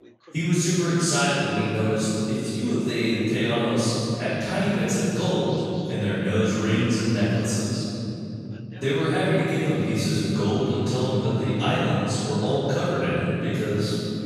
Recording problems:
room echo; strong; dies away in 3 s
off-mic speech; far
background chatter; faint; throughout; 2 voices, 25 dB below the speech

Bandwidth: 14.5 kHz